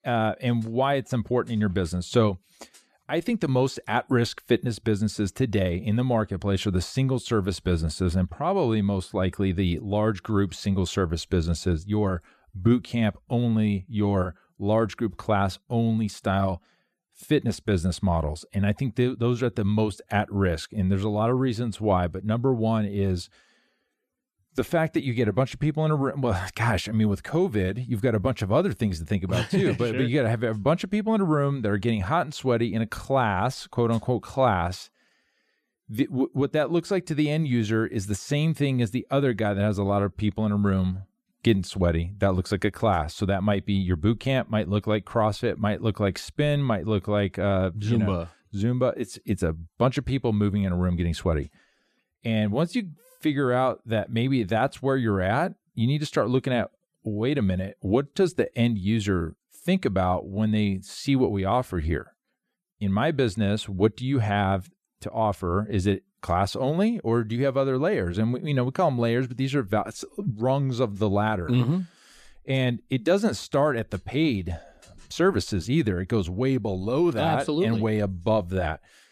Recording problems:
none

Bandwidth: 14.5 kHz